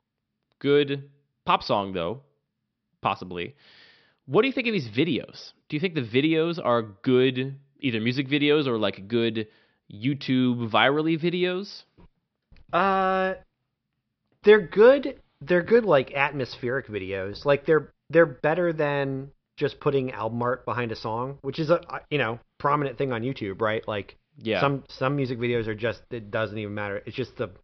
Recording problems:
high frequencies cut off; noticeable; nothing above 5.5 kHz

